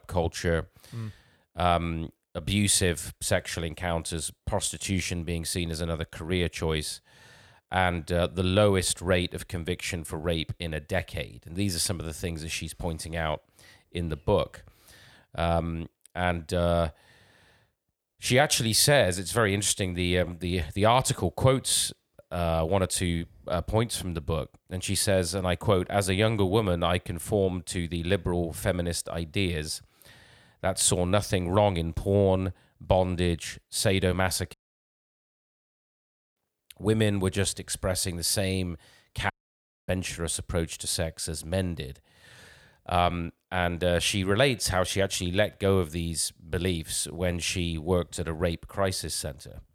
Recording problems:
audio cutting out; at 35 s for 2 s and at 39 s for 0.5 s

